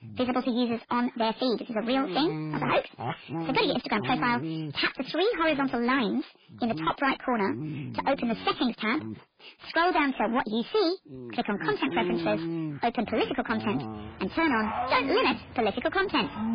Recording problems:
distortion; heavy; 8 dB below the speech
garbled, watery; badly; nothing above 4 kHz
wrong speed and pitch; too fast and too high; 1.5 times normal speed
animal sounds; loud; throughout; 9 dB below the speech

